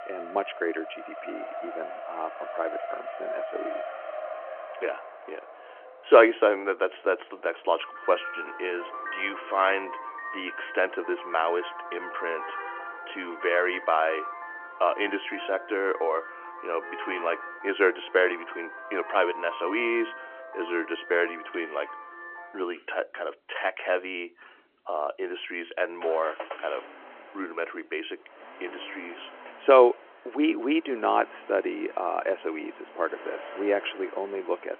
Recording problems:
phone-call audio; nothing above 3 kHz
traffic noise; noticeable; throughout; 10 dB below the speech

